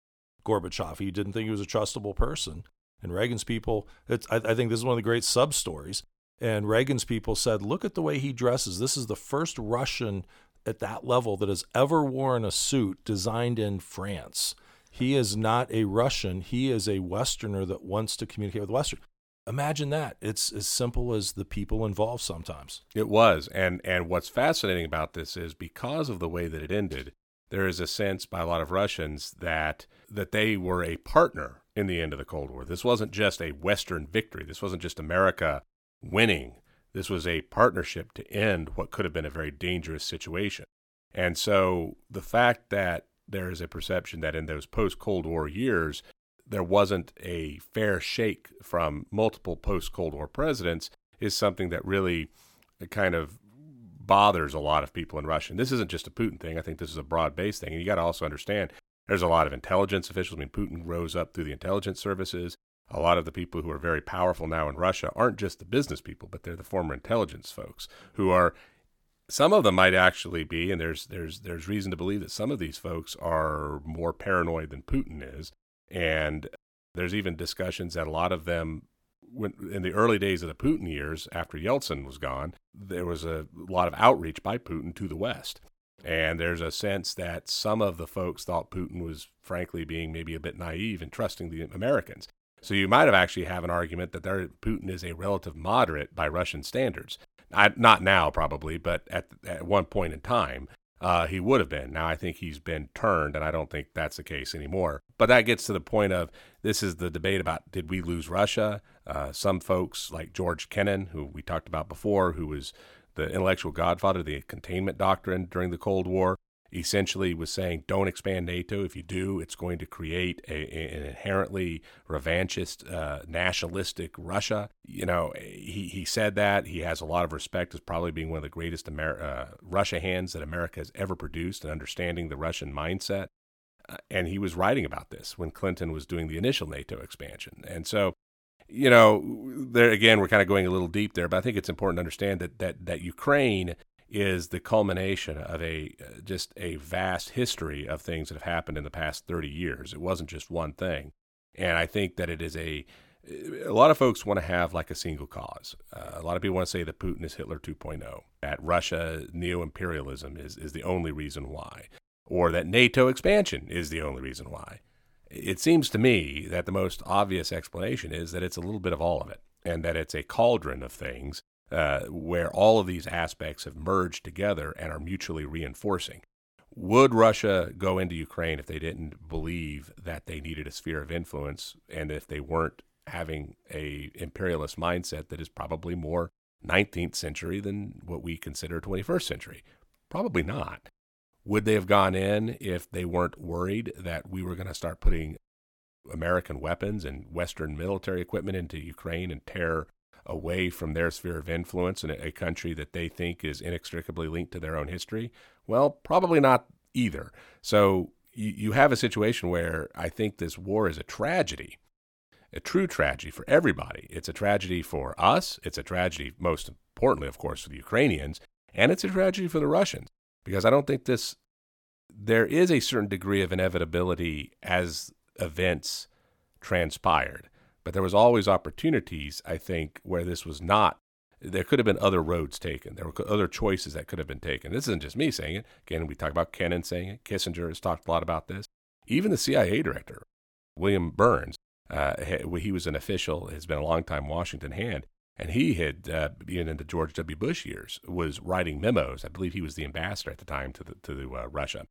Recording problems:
none

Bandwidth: 17.5 kHz